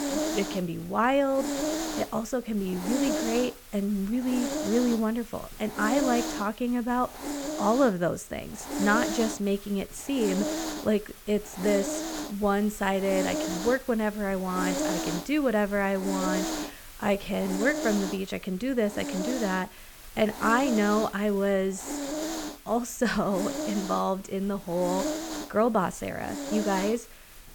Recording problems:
hiss; loud; throughout; 5 dB below the speech

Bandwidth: 18 kHz